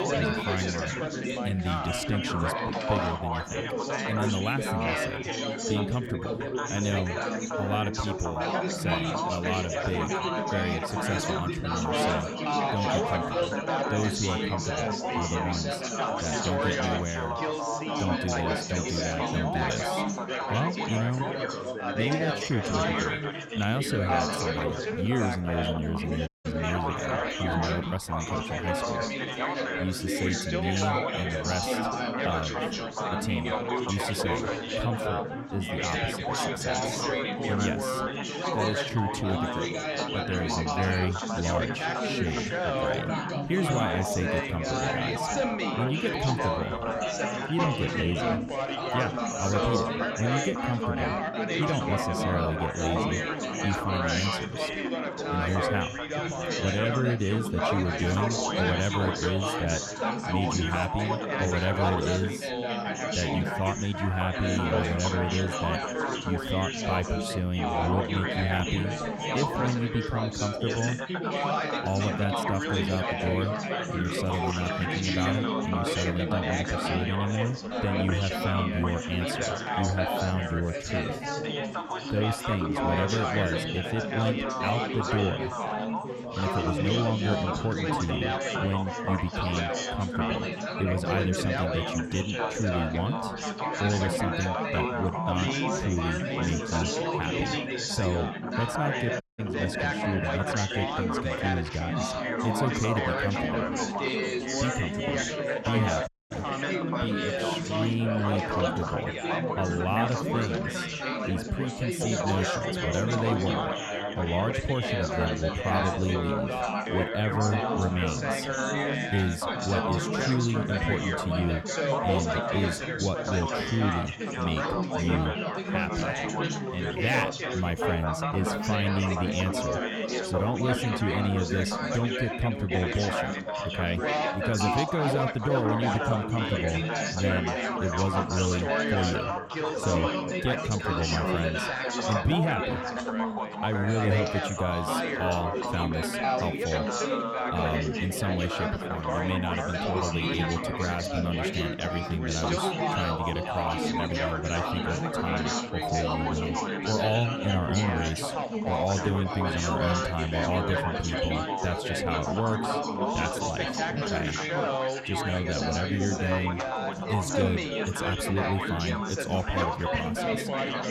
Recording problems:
chatter from many people; very loud; throughout; 2 dB above the speech
audio cutting out; at 26 s, at 1:39 and at 1:46

